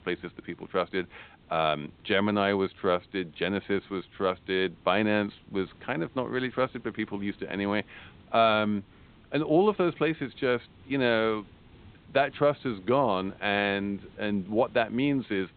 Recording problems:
high frequencies cut off; severe; nothing above 4 kHz
hiss; faint; throughout; 25 dB below the speech

